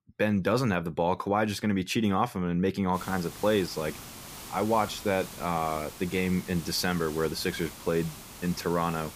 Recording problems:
hiss; noticeable; from 3 s on; 15 dB below the speech

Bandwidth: 15 kHz